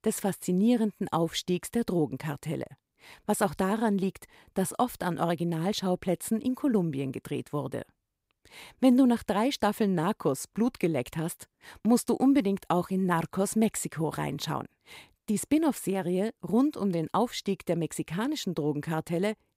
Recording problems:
none

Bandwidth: 15.5 kHz